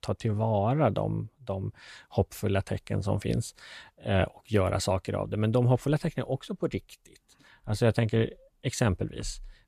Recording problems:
none

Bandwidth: 14.5 kHz